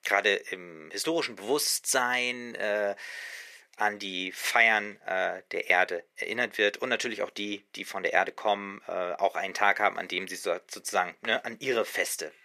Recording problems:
thin; very; fading below 350 Hz

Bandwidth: 14.5 kHz